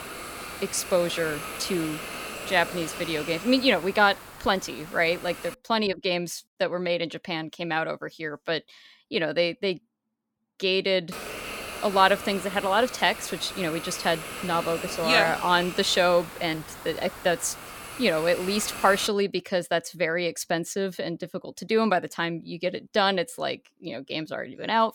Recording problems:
hiss; noticeable; until 5.5 s and from 11 to 19 s; 10 dB below the speech

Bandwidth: 18 kHz